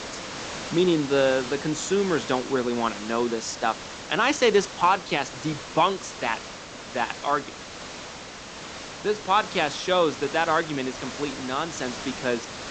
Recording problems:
high frequencies cut off; noticeable; nothing above 8 kHz
hiss; noticeable; throughout; 10 dB below the speech

